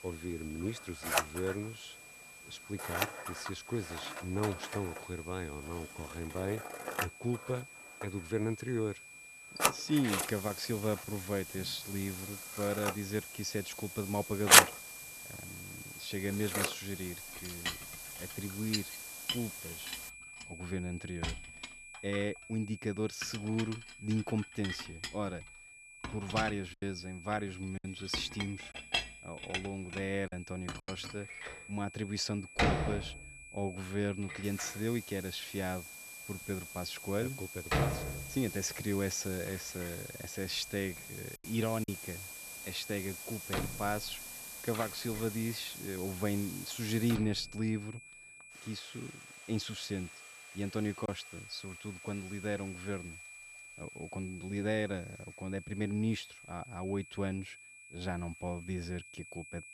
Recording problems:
household noises; very loud; throughout; 4 dB above the speech
hiss; loud; from 10 to 20 s and from 34 to 47 s; 7 dB below the speech
high-pitched whine; noticeable; throughout; 2.5 kHz, 10 dB below the speech
choppy; occasionally; from 27 to 31 s, at 41 s and at 51 s; 4% of the speech affected

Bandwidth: 13.5 kHz